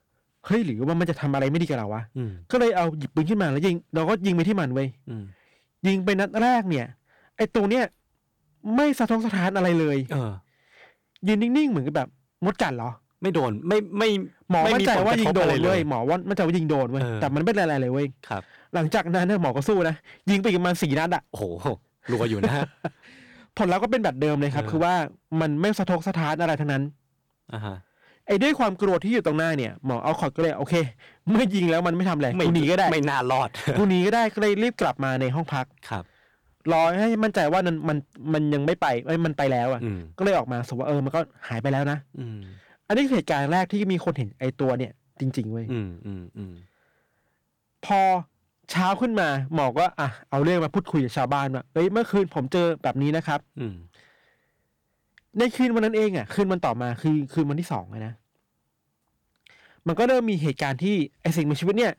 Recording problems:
distortion; slight; 5% of the sound clipped

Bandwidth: 18.5 kHz